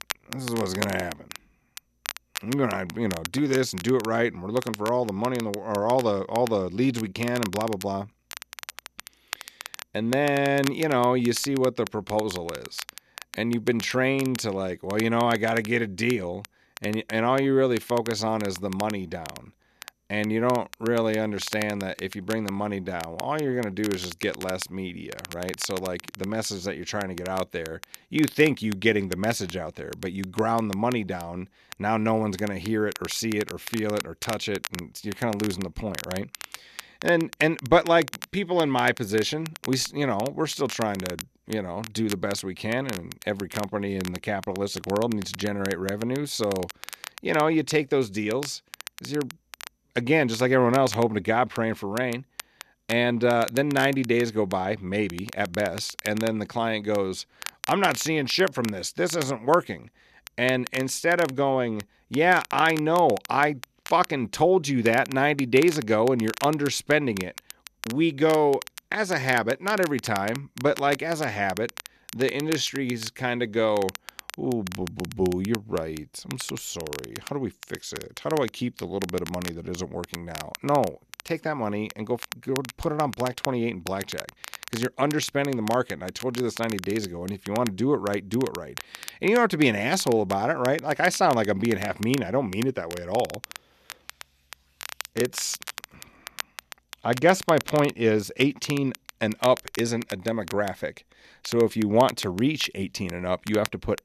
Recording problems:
crackle, like an old record; noticeable; 15 dB below the speech

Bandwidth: 14 kHz